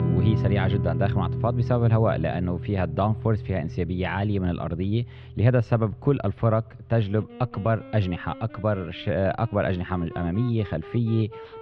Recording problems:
muffled; slightly; fading above 3.5 kHz
background music; loud; throughout; 6 dB below the speech

